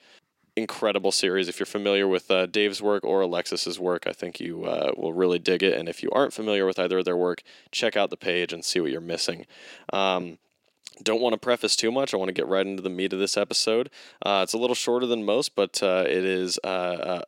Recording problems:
thin; somewhat; fading below 400 Hz

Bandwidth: 16 kHz